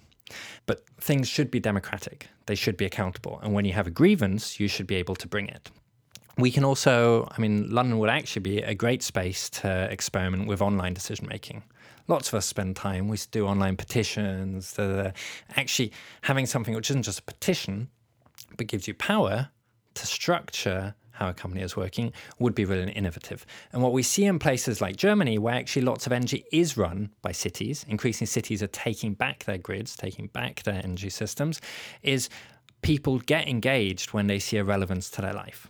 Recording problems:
none

